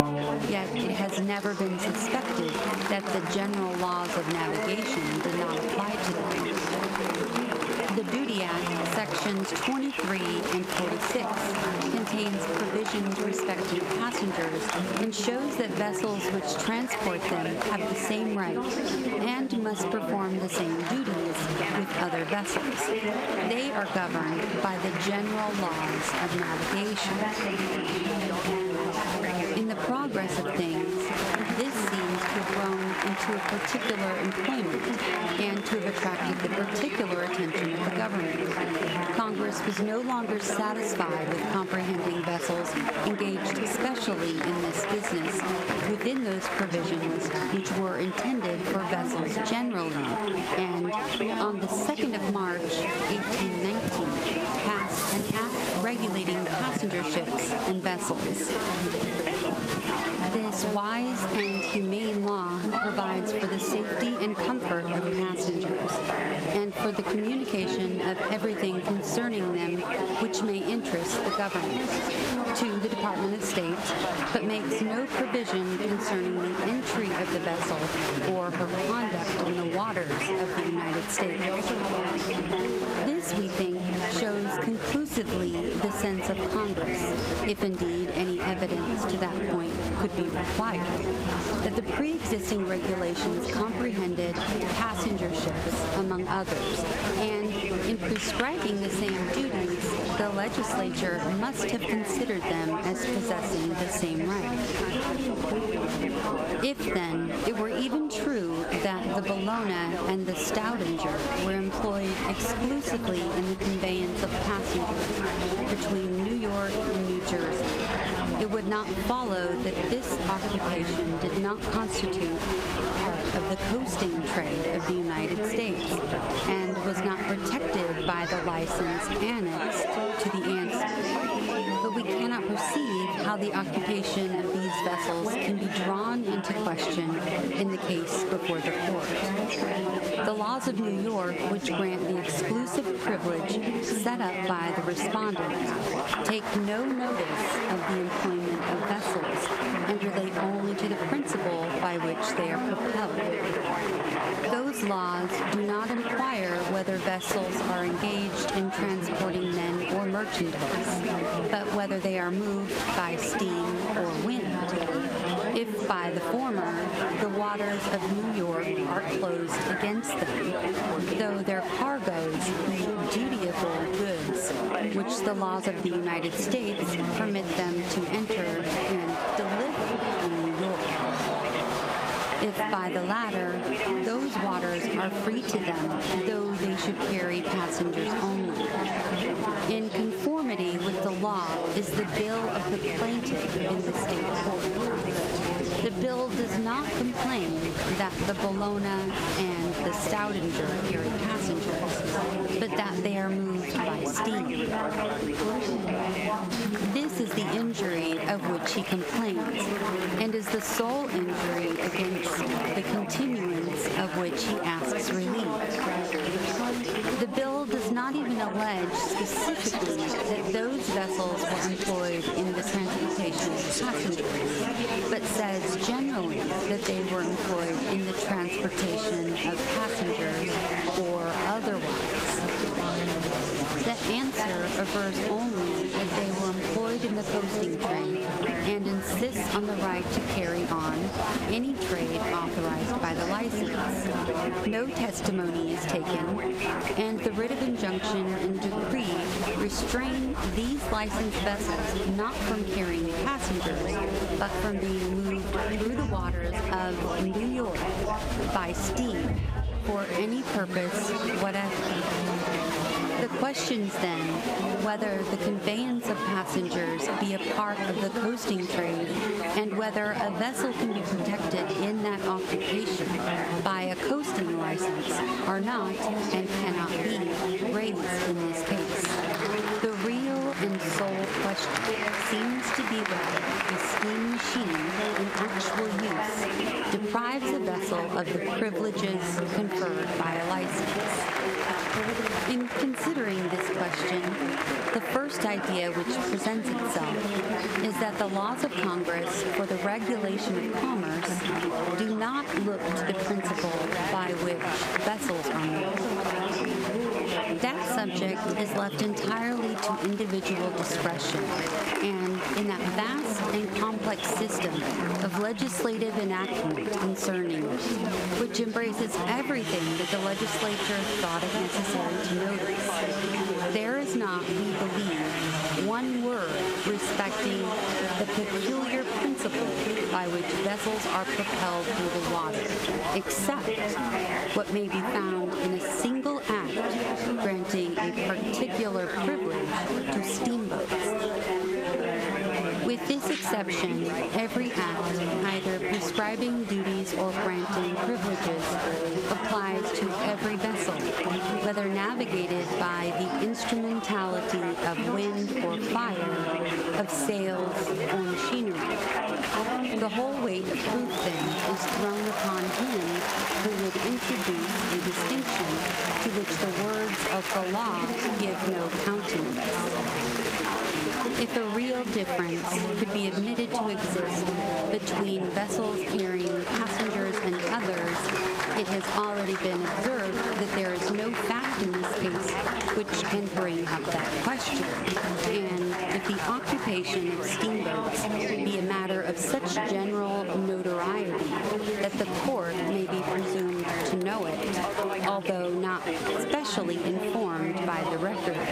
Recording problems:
squashed, flat; somewhat
chatter from many people; very loud; throughout; 1 dB above the speech
high-pitched whine; faint; throughout; 8.5 kHz, 30 dB below the speech

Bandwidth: 15.5 kHz